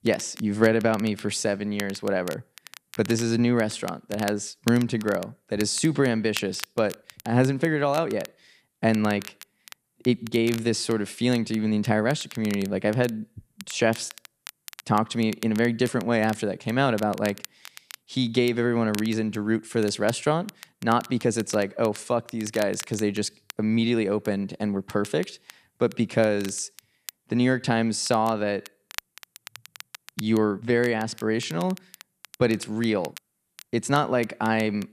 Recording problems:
crackle, like an old record; noticeable; 20 dB below the speech

